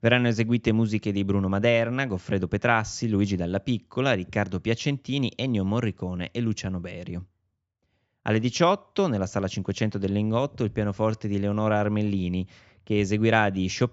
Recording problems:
high frequencies cut off; noticeable; nothing above 8 kHz

